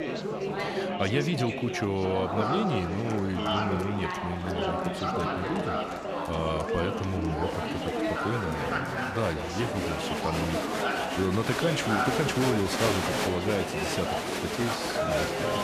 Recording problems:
chatter from many people; very loud; throughout; 1 dB above the speech

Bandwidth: 14.5 kHz